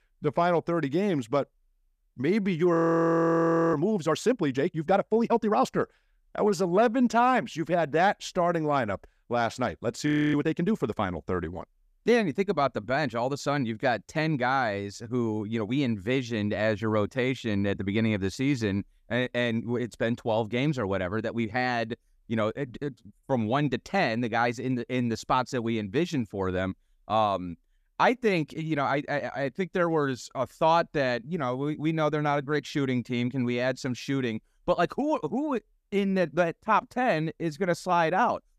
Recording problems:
audio freezing; at 2.5 s for 1 s and at 10 s

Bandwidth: 14.5 kHz